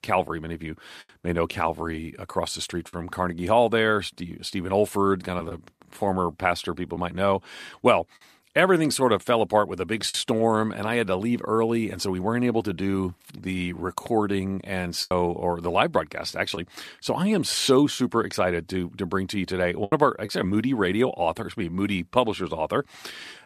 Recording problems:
choppy; occasionally; 2% of the speech affected

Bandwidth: 14.5 kHz